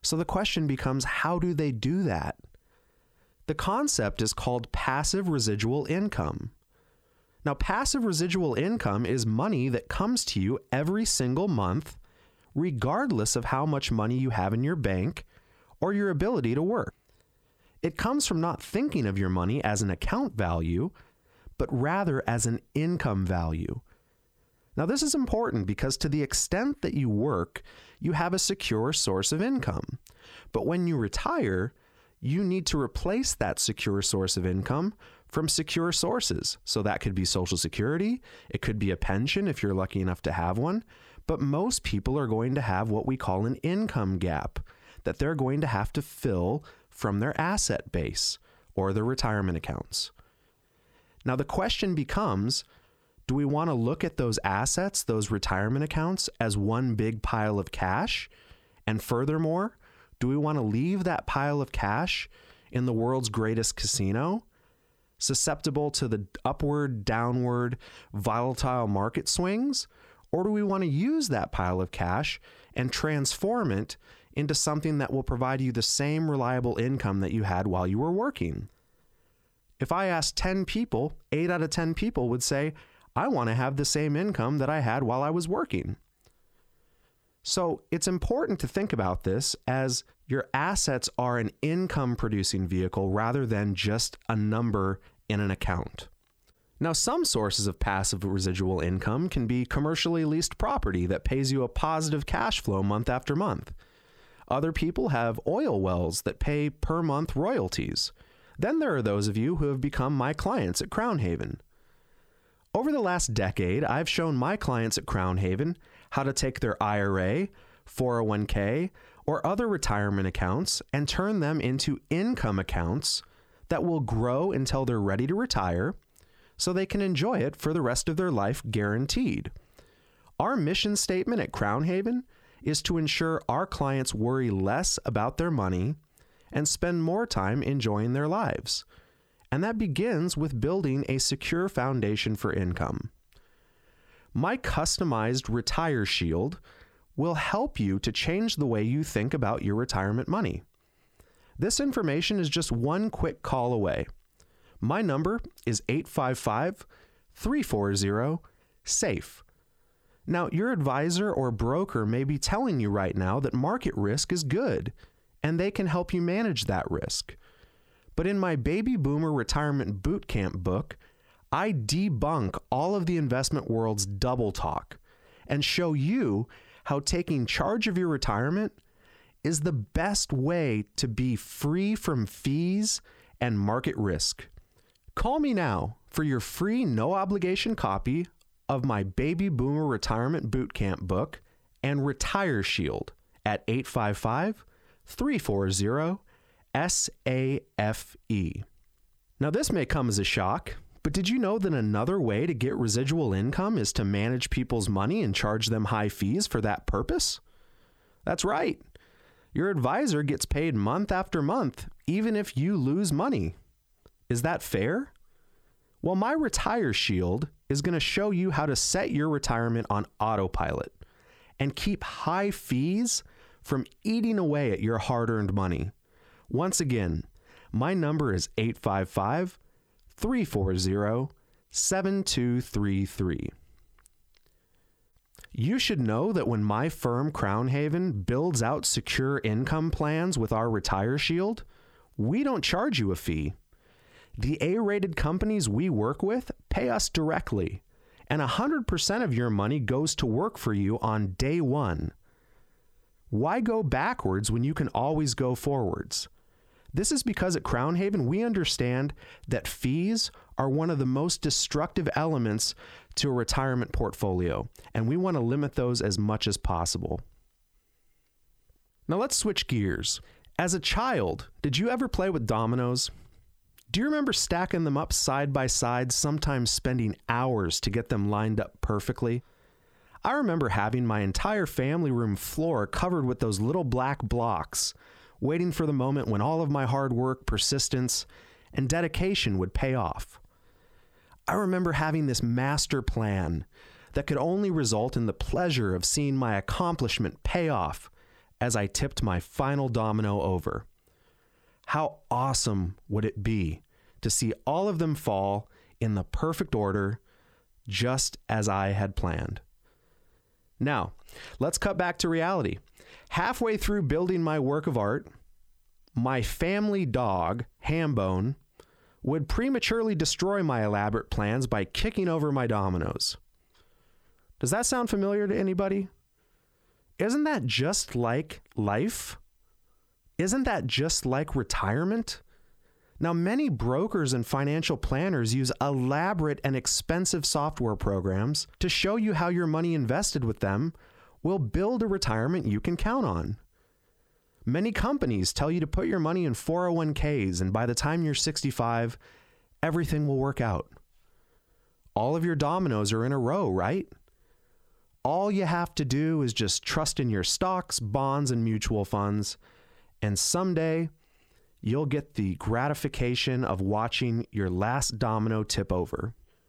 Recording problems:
squashed, flat; somewhat

